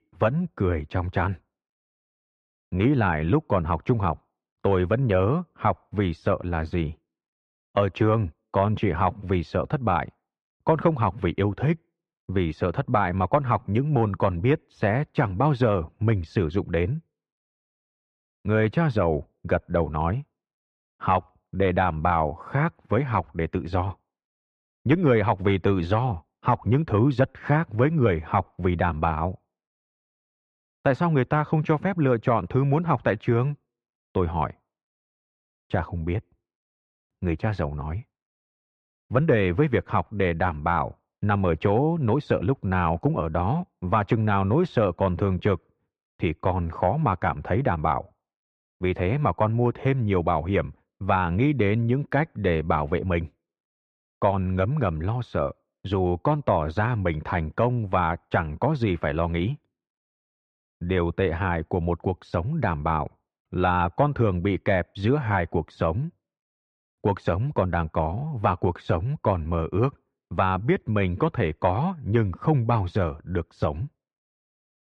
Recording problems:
muffled; slightly; fading above 2 kHz

